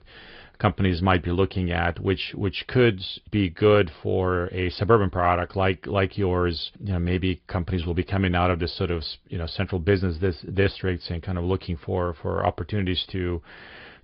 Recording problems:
high frequencies cut off; severe; nothing above 5 kHz
garbled, watery; slightly

